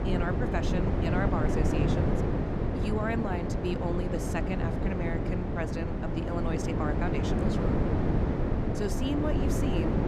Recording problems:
wind noise on the microphone; heavy; 1 dB above the speech

